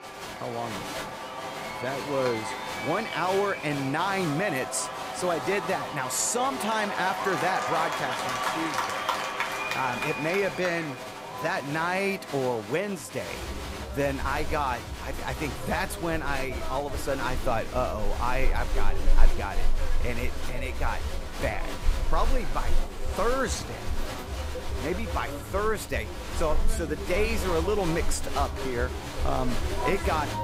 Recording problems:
crowd noise; loud; throughout; 3 dB below the speech

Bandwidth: 15.5 kHz